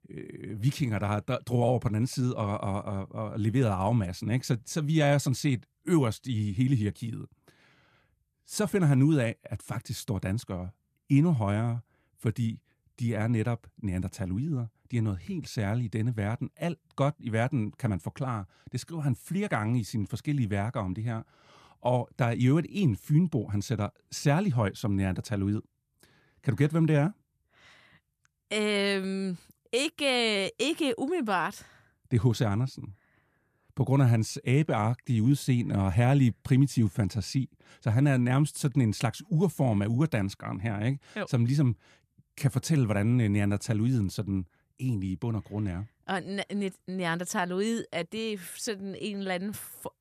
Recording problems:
none

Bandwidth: 14.5 kHz